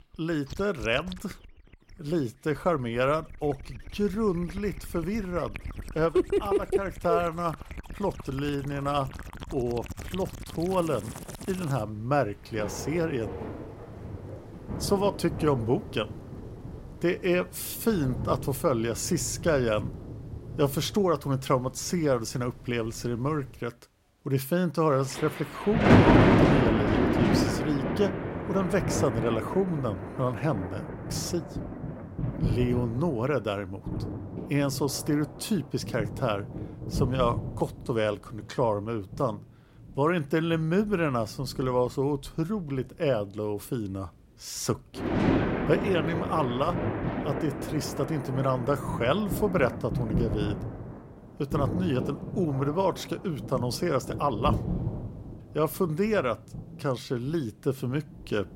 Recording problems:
rain or running water; loud; throughout; 2 dB below the speech

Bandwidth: 16 kHz